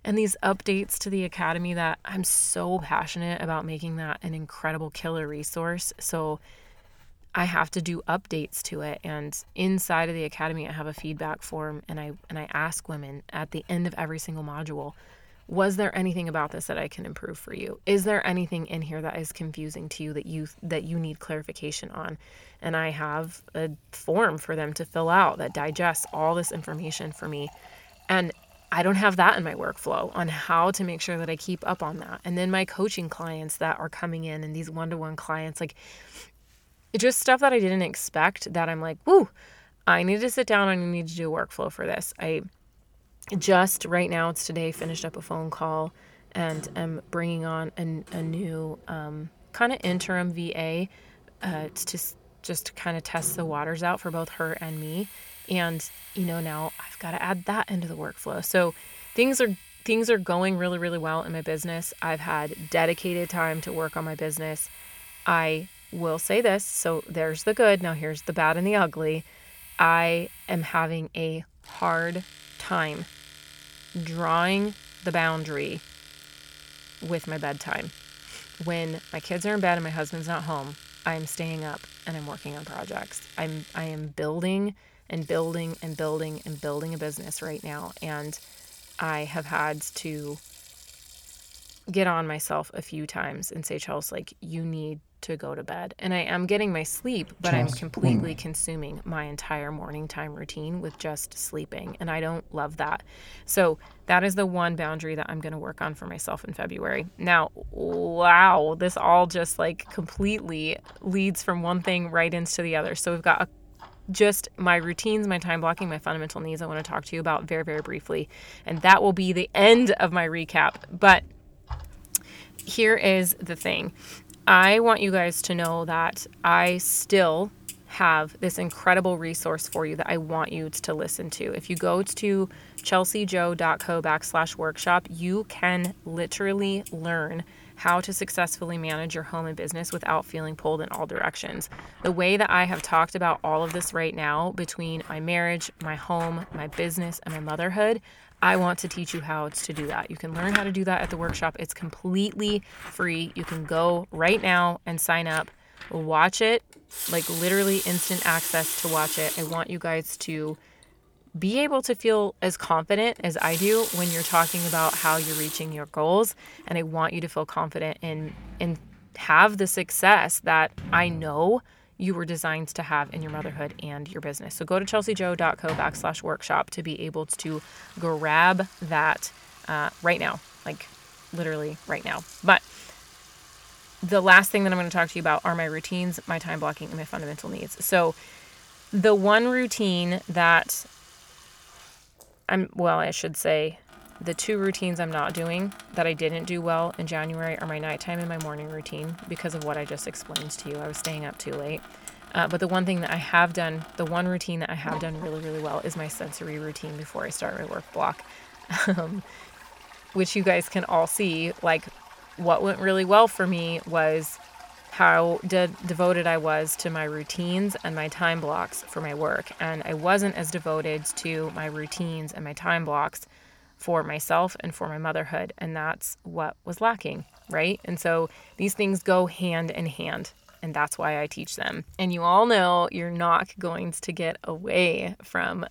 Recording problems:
household noises; noticeable; throughout; 15 dB below the speech

